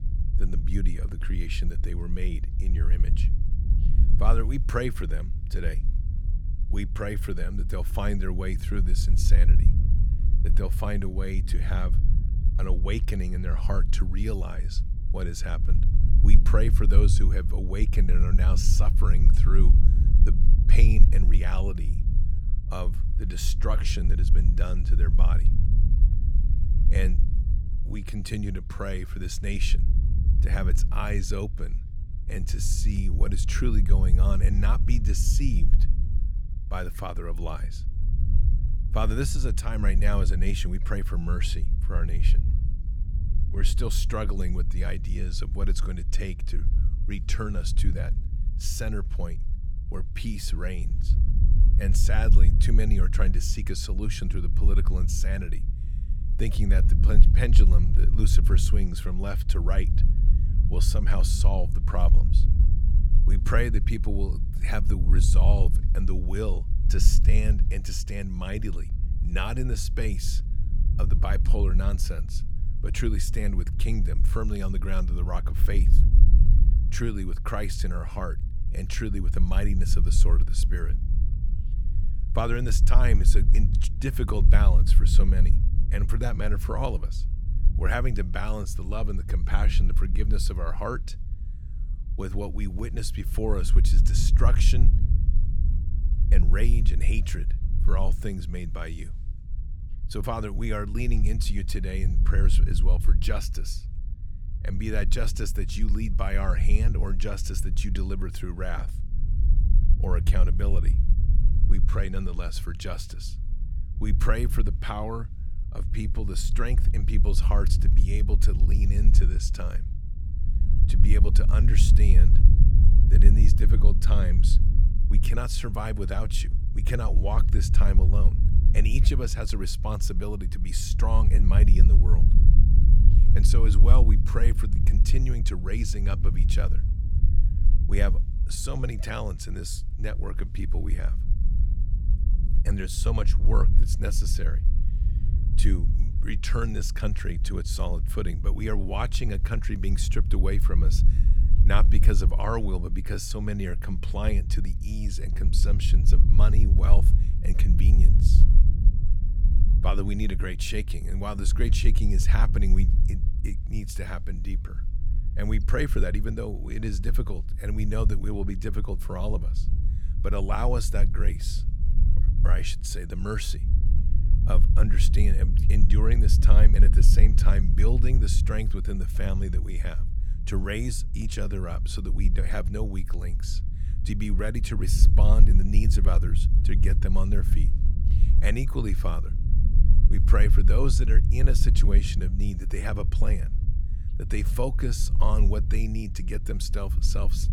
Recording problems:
low rumble; loud; throughout; 9 dB below the speech

